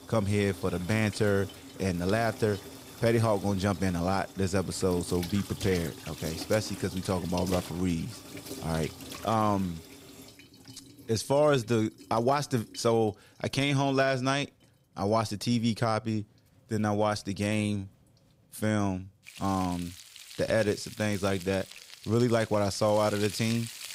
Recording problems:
household noises; noticeable; throughout; 15 dB below the speech

